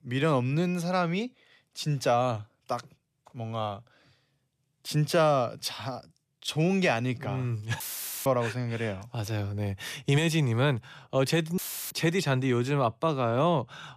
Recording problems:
audio cutting out; filled with static; at 8 s and at 12 s

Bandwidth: 14.5 kHz